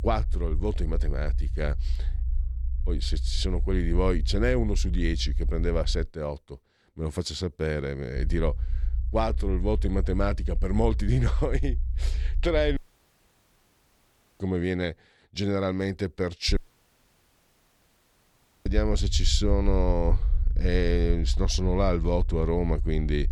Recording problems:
low rumble; faint; until 6 s, from 8 to 13 s and from 16 s on; 20 dB below the speech
audio cutting out; at 13 s for 1.5 s and at 17 s for 2 s

